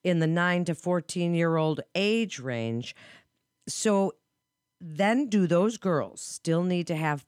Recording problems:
none

